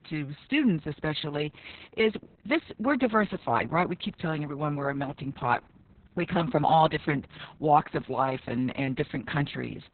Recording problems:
garbled, watery; badly; nothing above 4 kHz

